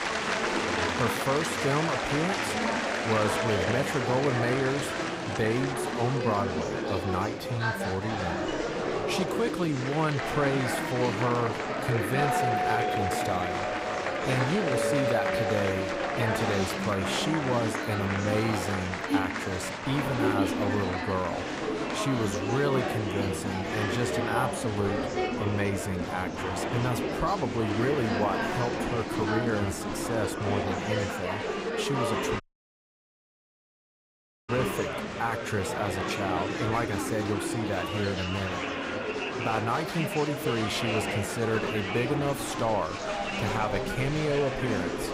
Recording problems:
murmuring crowd; very loud; throughout; as loud as the speech
dog barking; faint; at 0.5 s; peak 10 dB below the speech
doorbell; loud; from 12 to 17 s; peak 3 dB above the speech
audio cutting out; at 32 s for 2 s

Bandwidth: 15.5 kHz